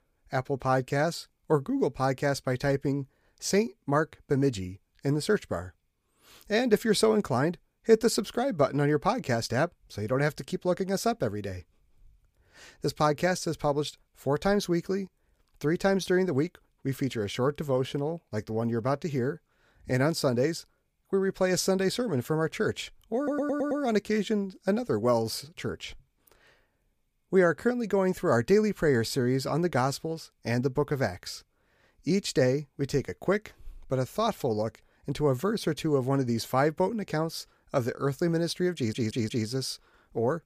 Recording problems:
audio stuttering; at 23 s and at 39 s

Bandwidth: 15 kHz